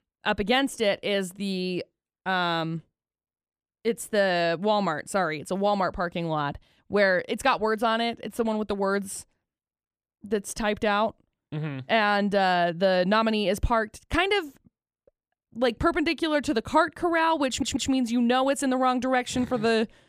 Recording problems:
audio stuttering; at 17 s

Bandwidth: 14.5 kHz